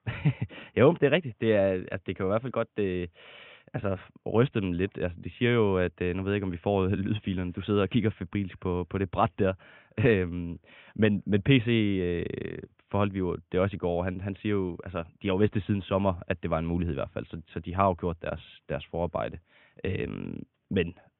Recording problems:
high frequencies cut off; severe; nothing above 3.5 kHz

